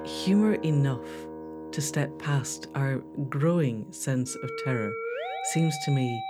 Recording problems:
background music; loud; throughout; 9 dB below the speech

